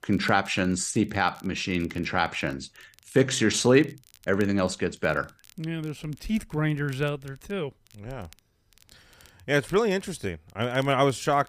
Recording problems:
crackle, like an old record; faint; 30 dB below the speech

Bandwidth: 15 kHz